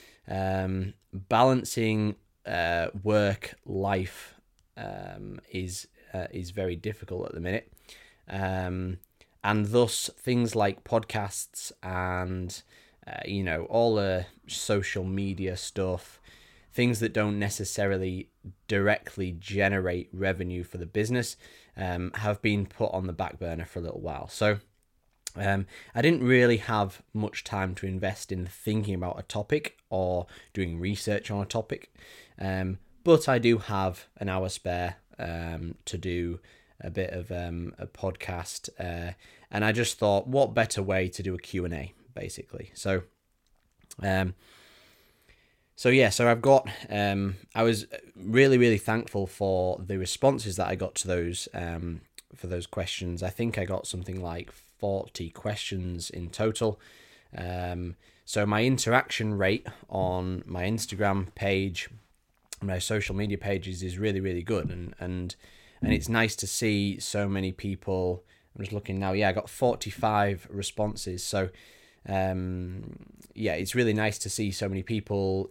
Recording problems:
none

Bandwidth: 16.5 kHz